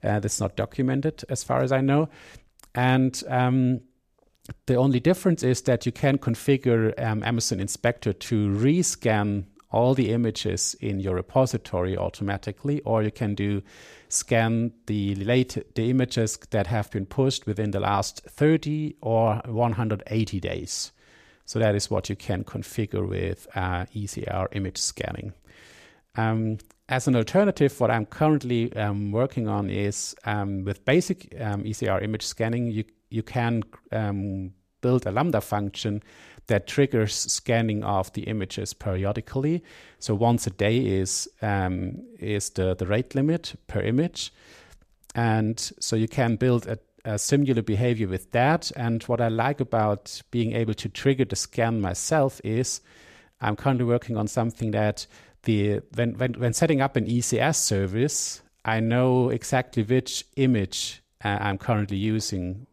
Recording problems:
none

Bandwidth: 14.5 kHz